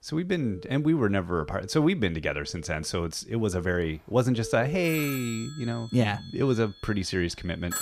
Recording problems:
alarms or sirens; noticeable; throughout; 15 dB below the speech

